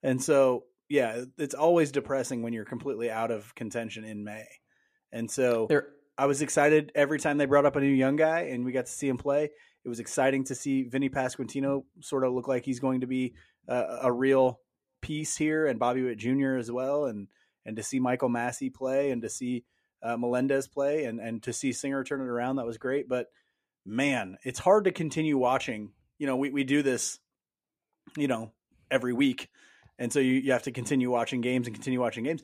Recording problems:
none

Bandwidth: 14.5 kHz